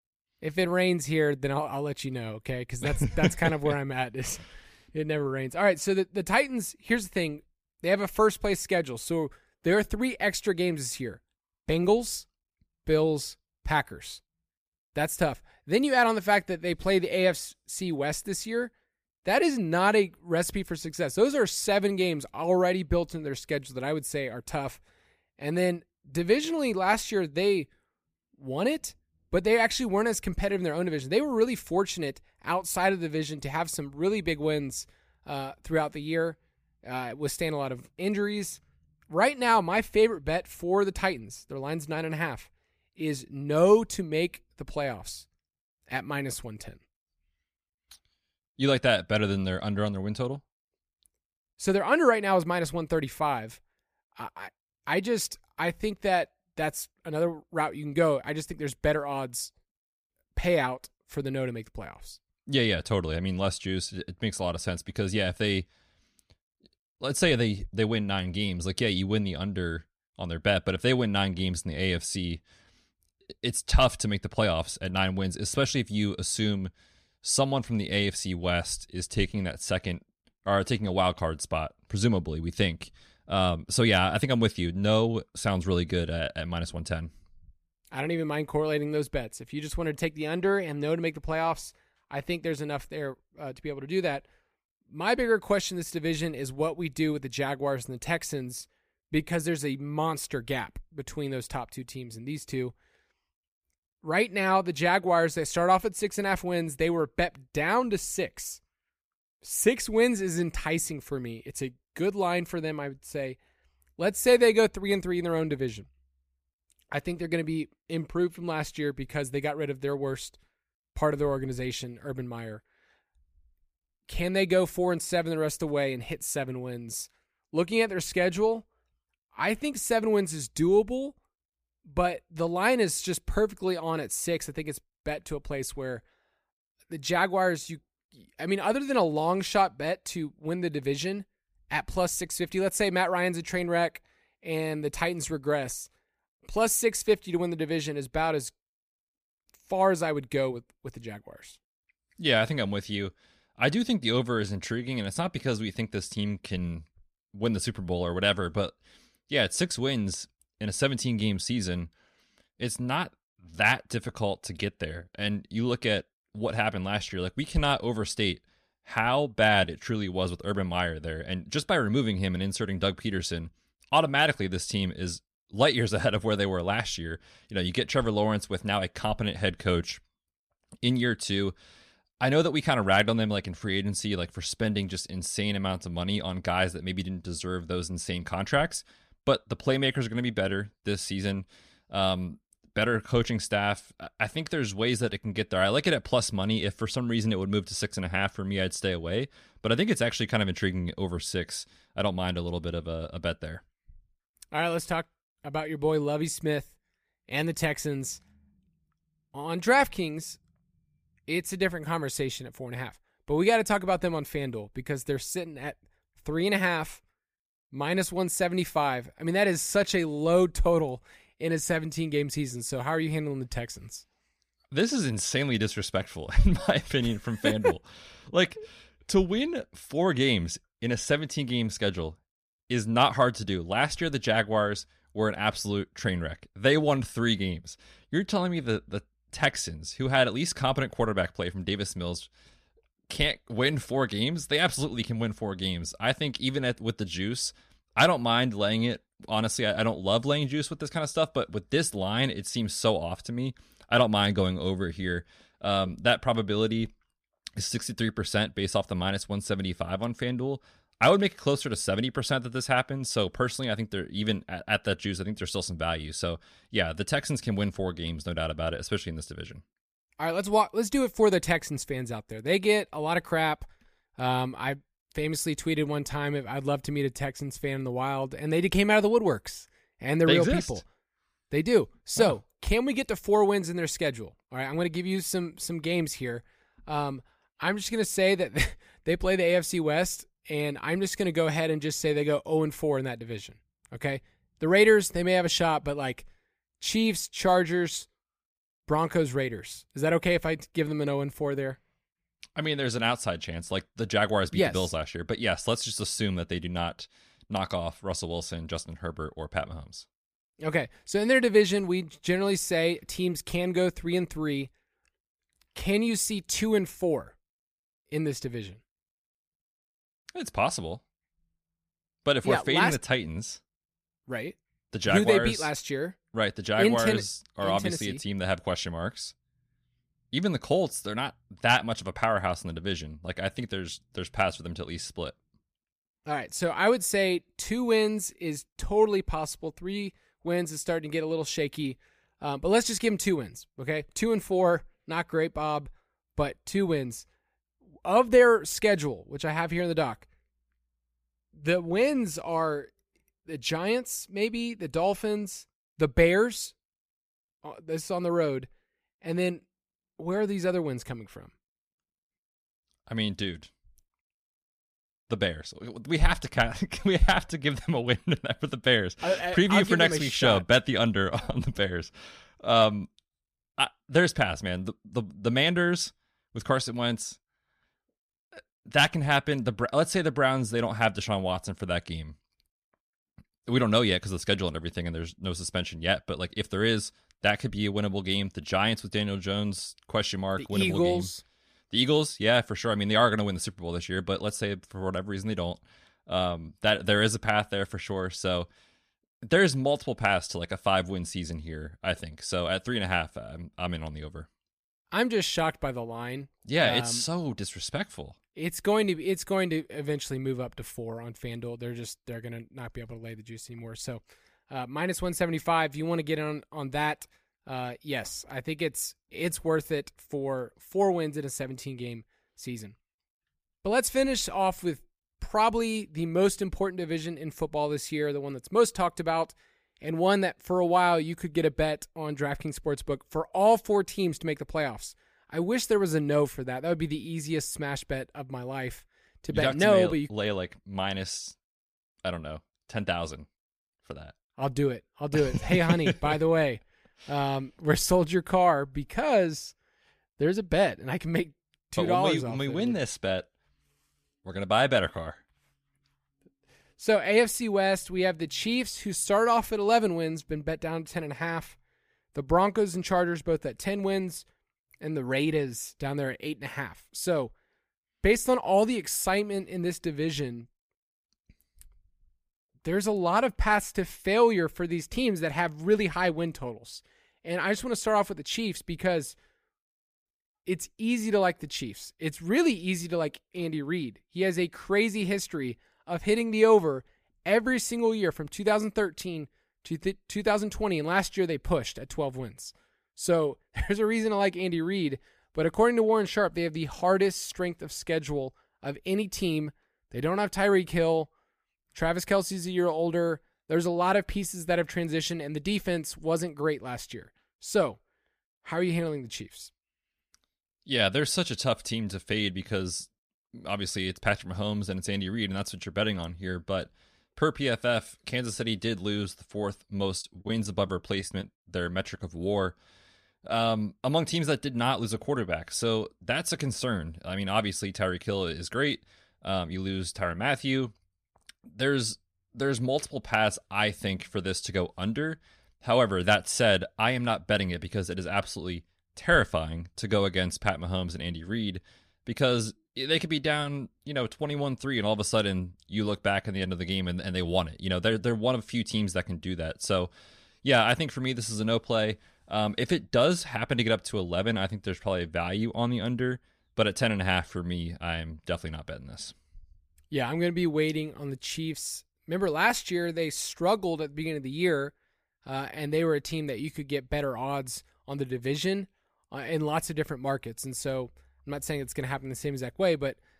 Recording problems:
choppy; very; from 8:40 to 8:41; 12% of the speech affected

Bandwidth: 15 kHz